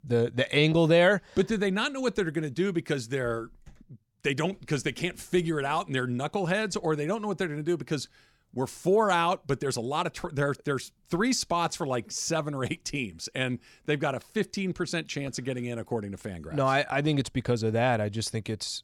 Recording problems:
none

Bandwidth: 18 kHz